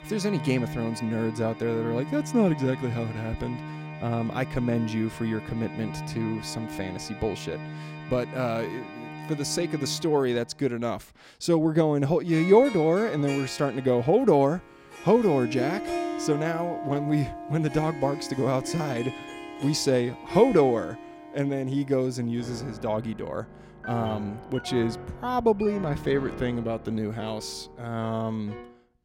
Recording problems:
background music; noticeable; throughout; 10 dB below the speech

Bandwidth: 16 kHz